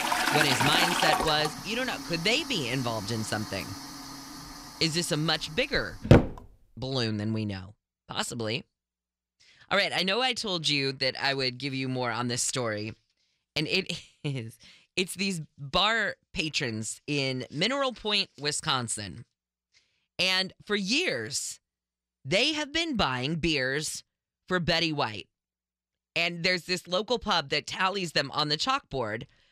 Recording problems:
household noises; very loud; until 6.5 s; 1 dB above the speech

